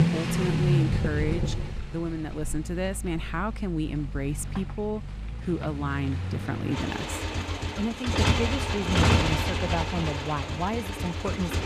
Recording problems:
traffic noise; very loud; throughout; 3 dB above the speech

